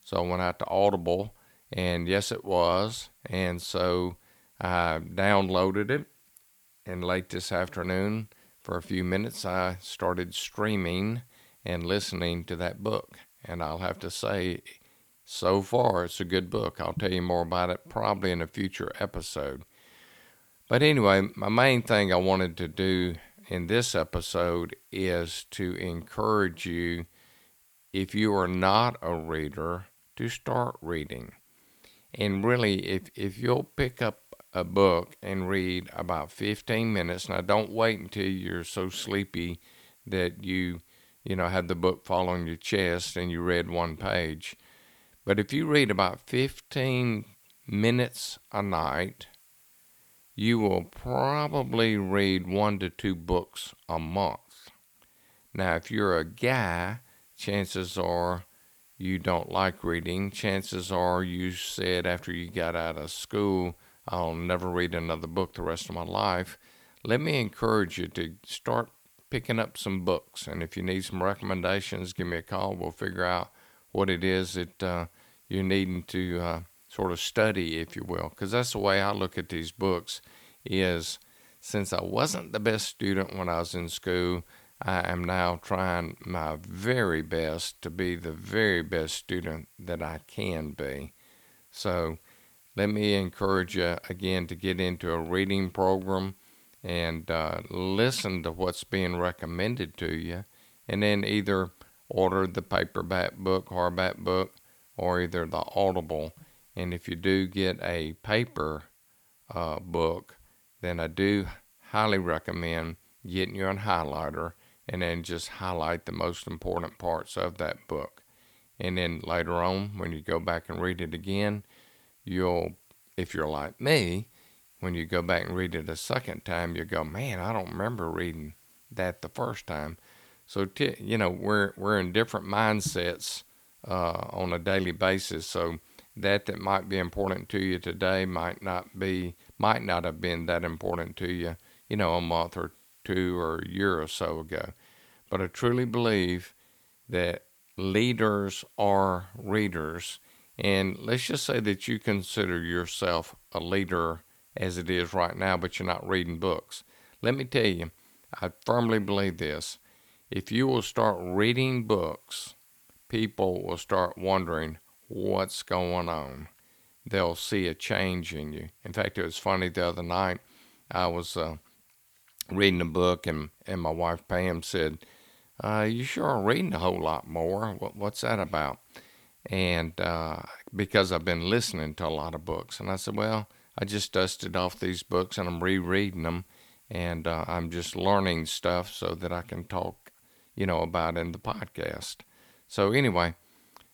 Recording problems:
hiss; faint; throughout; 30 dB below the speech

